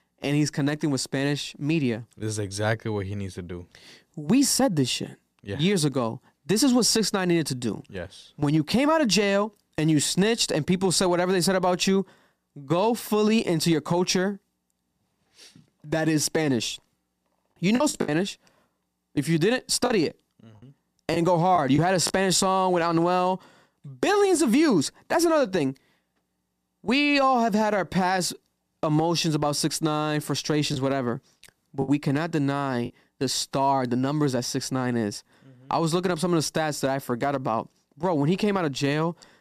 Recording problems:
choppy; very; at 18 s, from 20 to 22 s and from 31 to 33 s; 10% of the speech affected

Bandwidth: 14.5 kHz